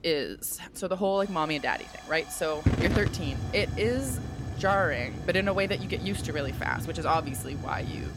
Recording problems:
hiss; loud; throughout; 5 dB below the speech

